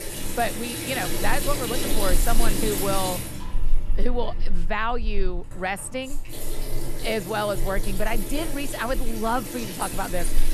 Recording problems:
household noises; loud; throughout; 1 dB below the speech

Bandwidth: 13.5 kHz